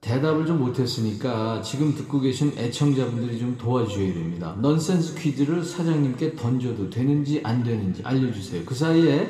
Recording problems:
room echo; slight; dies away in 1.8 s
off-mic speech; somewhat distant

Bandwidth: 14.5 kHz